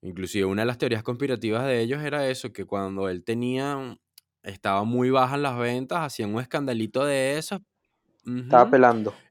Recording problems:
none

